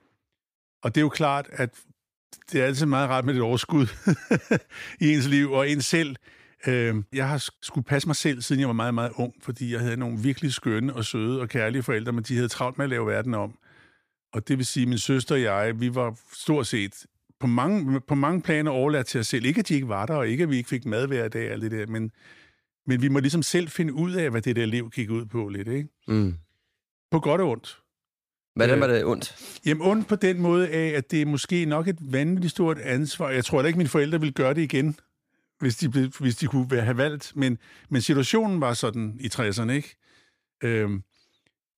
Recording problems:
uneven, jittery; strongly; from 2.5 to 33 s

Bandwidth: 15 kHz